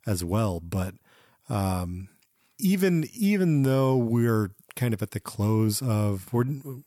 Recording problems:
none

